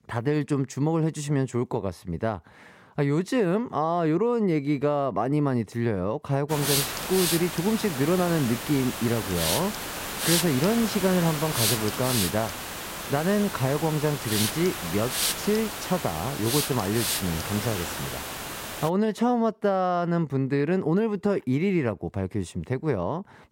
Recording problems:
hiss; loud; from 6.5 to 19 s; 2 dB below the speech

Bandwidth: 16 kHz